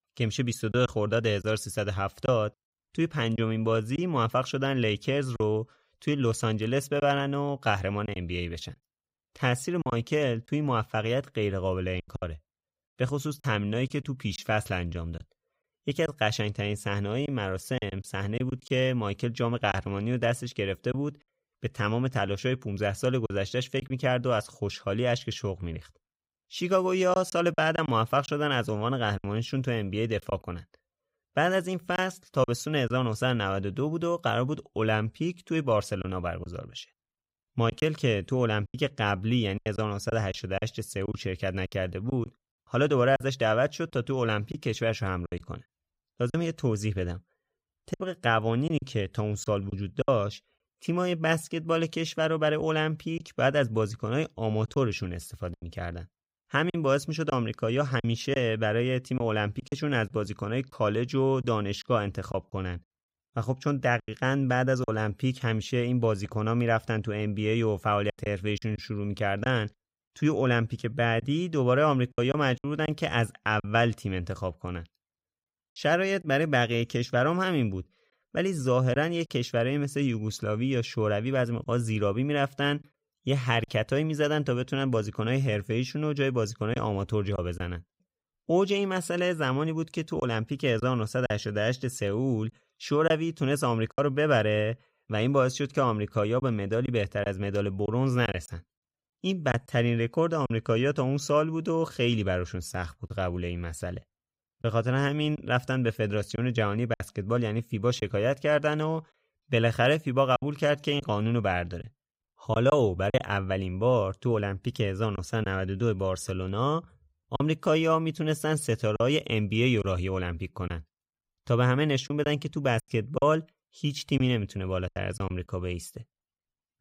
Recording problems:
choppy; occasionally; 4% of the speech affected

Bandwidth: 15.5 kHz